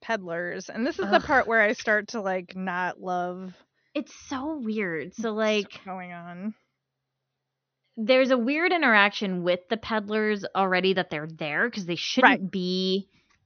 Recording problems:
high frequencies cut off; noticeable; nothing above 6.5 kHz

